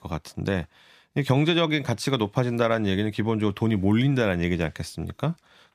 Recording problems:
none

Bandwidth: 15 kHz